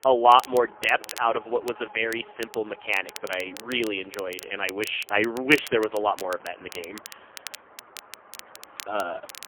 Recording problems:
phone-call audio; poor line; nothing above 3 kHz
crackle, like an old record; noticeable; 15 dB below the speech
traffic noise; faint; throughout; 25 dB below the speech

